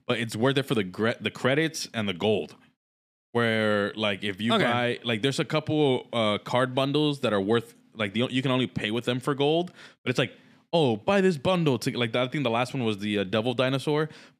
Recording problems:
none

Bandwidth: 15 kHz